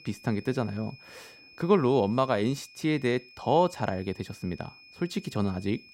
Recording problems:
high-pitched whine; faint; throughout; 2.5 kHz, 20 dB below the speech

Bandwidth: 16 kHz